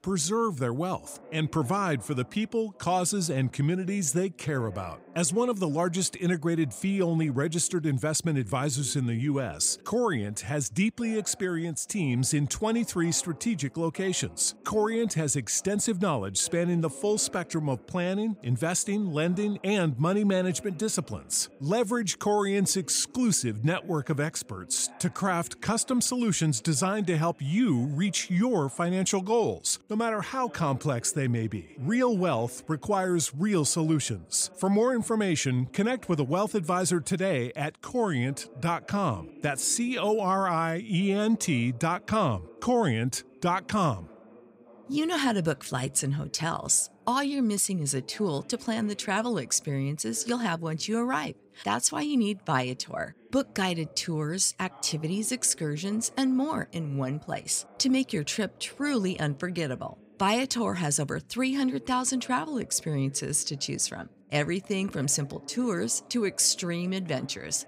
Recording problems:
voice in the background; faint; throughout; 25 dB below the speech

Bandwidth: 15.5 kHz